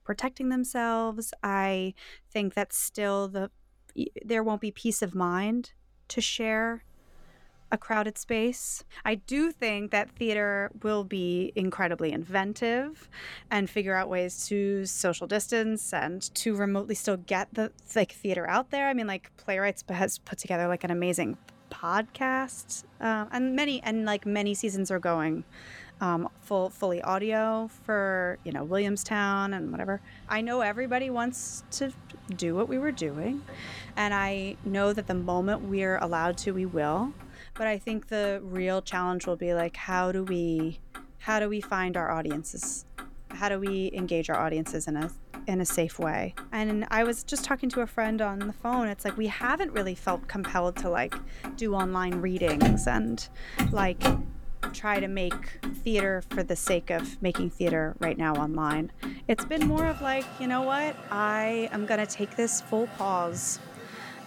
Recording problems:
traffic noise; loud; throughout; 9 dB below the speech

